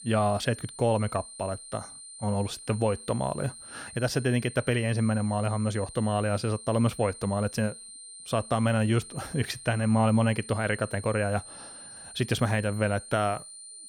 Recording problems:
high-pitched whine; noticeable; throughout; 9 kHz, 15 dB below the speech

